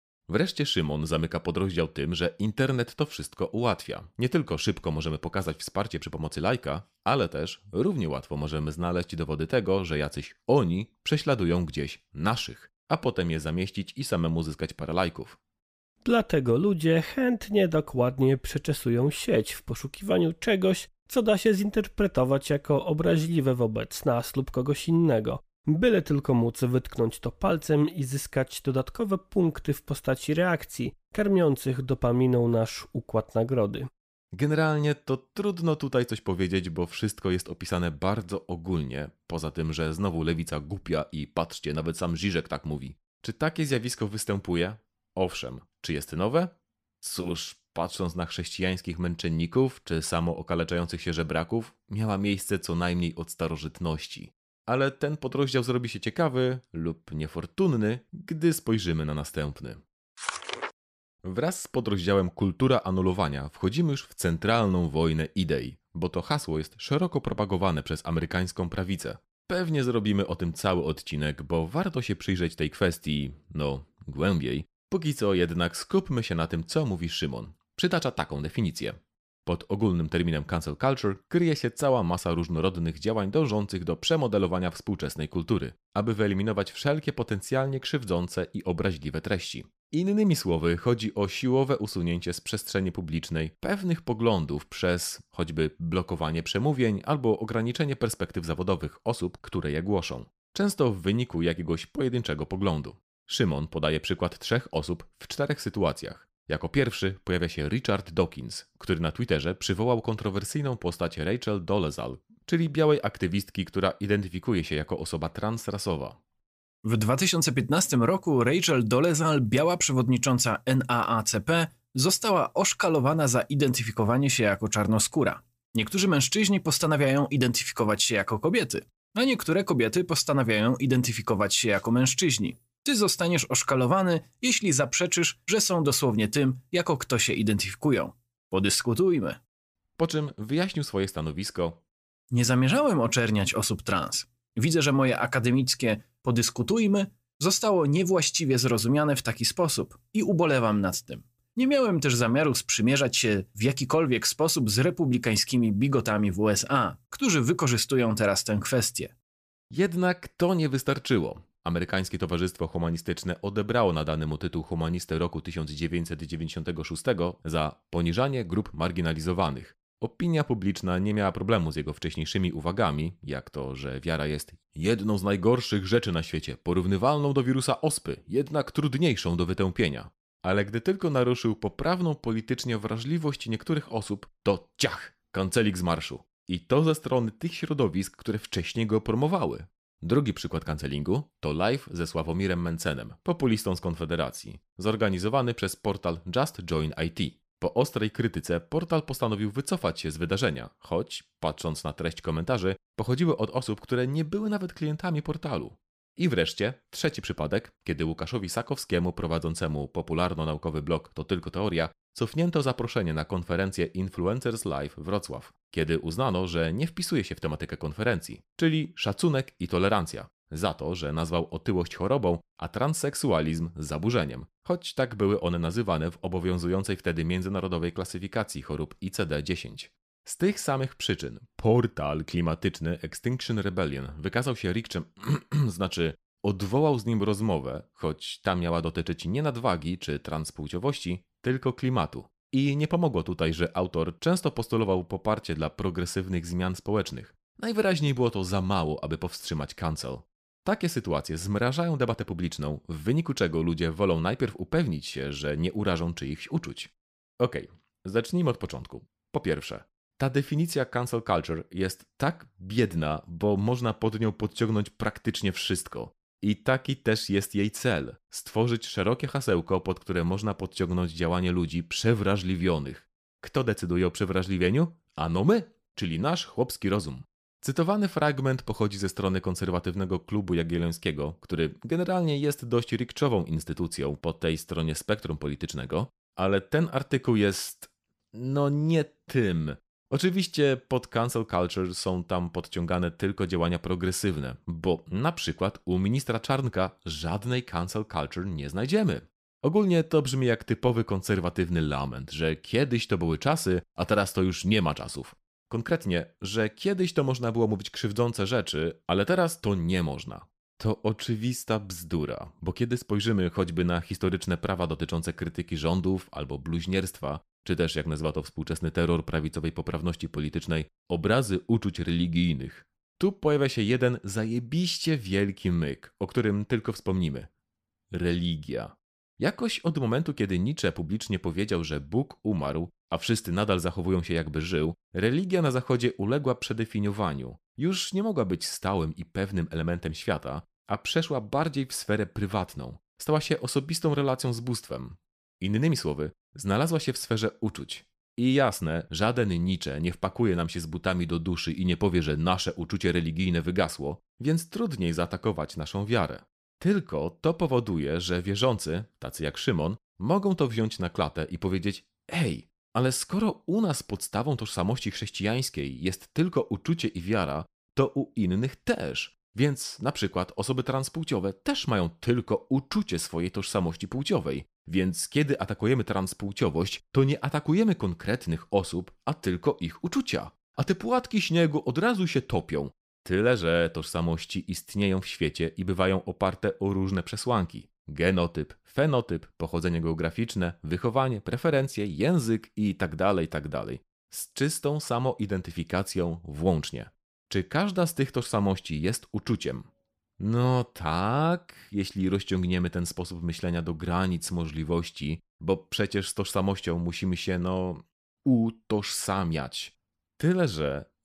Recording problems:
none

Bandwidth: 15 kHz